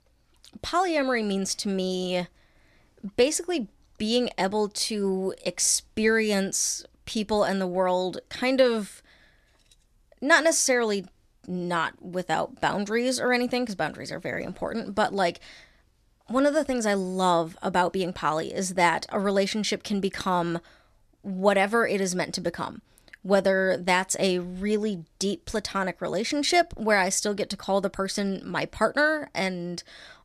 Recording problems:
none

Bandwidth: 14 kHz